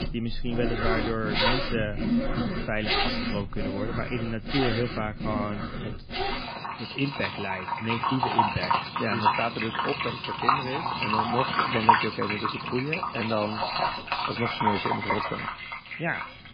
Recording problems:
garbled, watery; badly; nothing above 5 kHz
household noises; very loud; throughout; 3 dB above the speech

